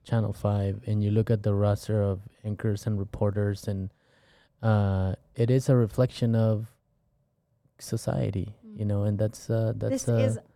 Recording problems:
muffled; slightly; fading above 3 kHz

